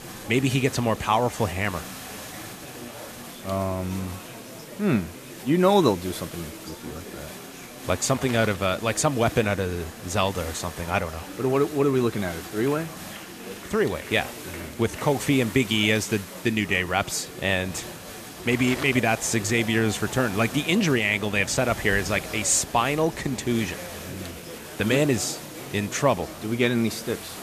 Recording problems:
chatter from many people; noticeable; throughout; 15 dB below the speech
hiss; noticeable; throughout; 15 dB below the speech
rain or running water; faint; throughout; 25 dB below the speech

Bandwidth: 14.5 kHz